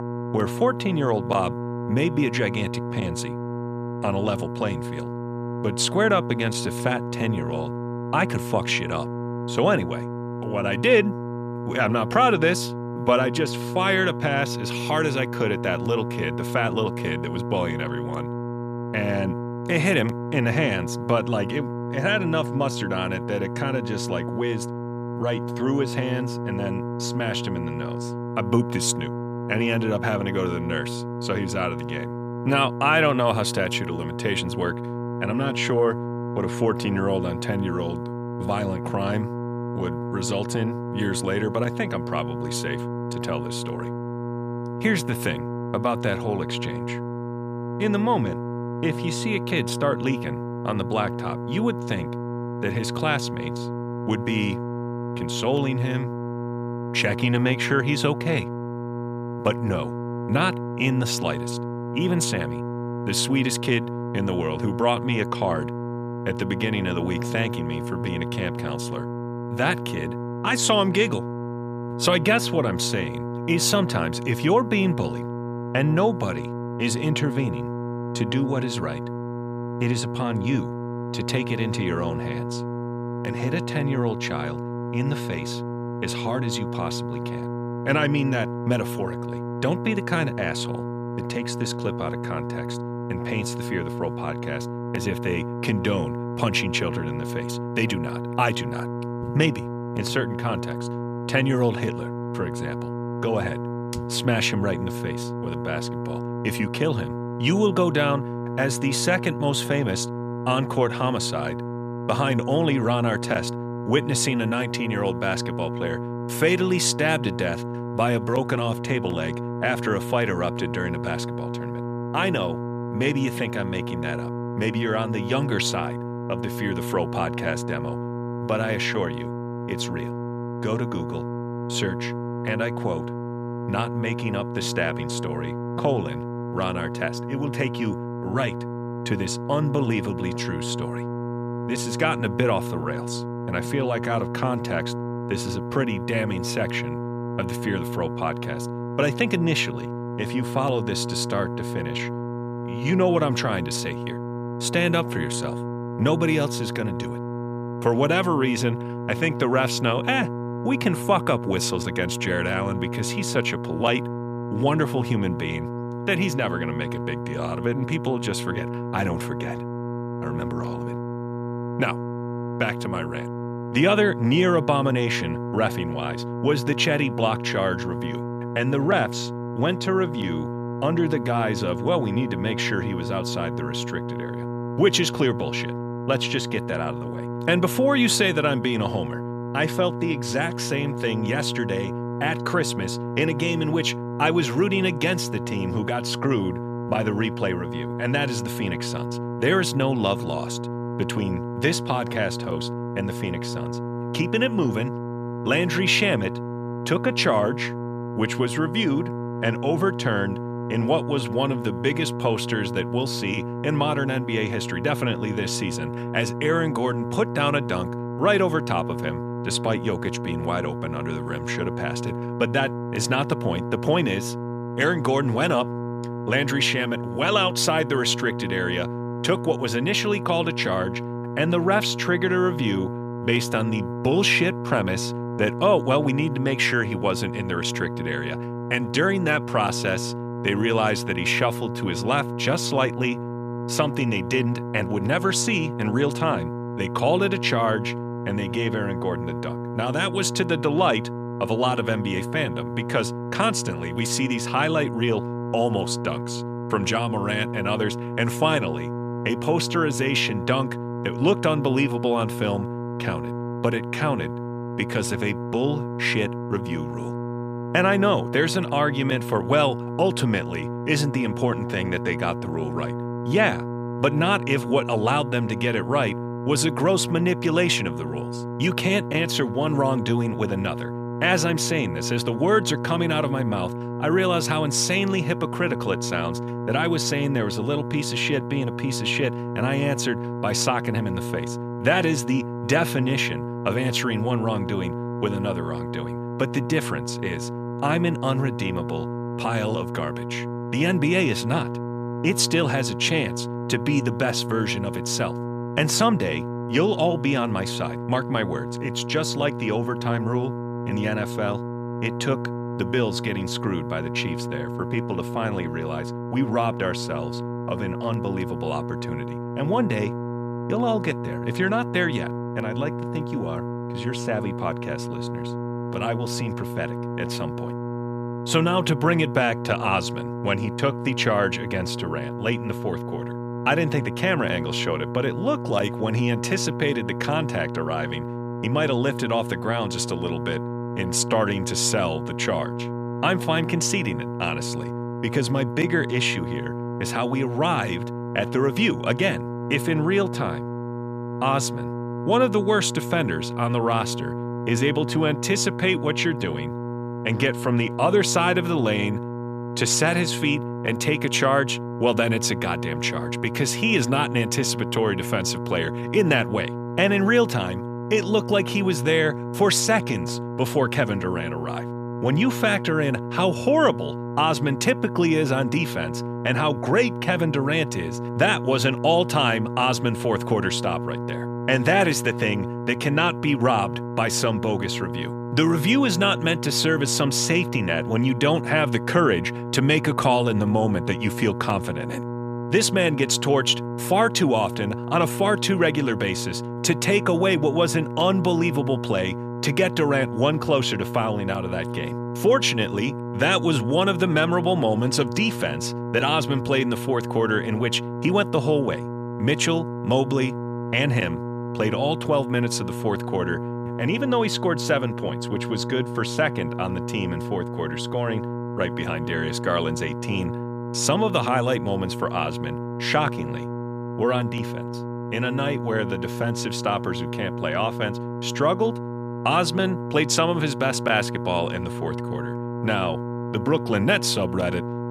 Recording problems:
electrical hum; loud; throughout; 60 Hz, 9 dB below the speech

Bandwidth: 14.5 kHz